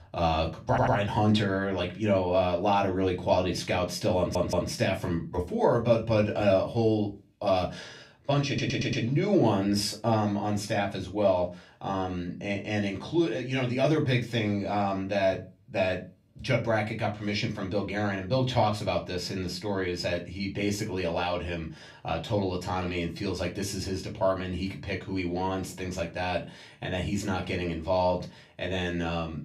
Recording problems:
off-mic speech; far
room echo; very slight; dies away in 0.2 s
audio stuttering; at 0.5 s, at 4 s and at 8.5 s

